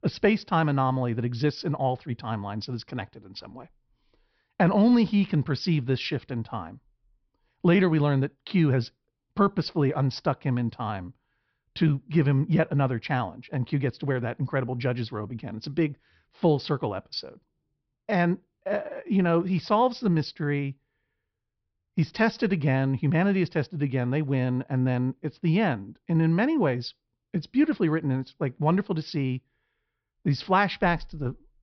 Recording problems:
high frequencies cut off; noticeable; nothing above 5.5 kHz

